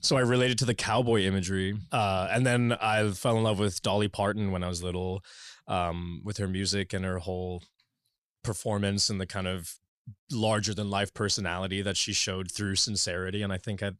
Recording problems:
none

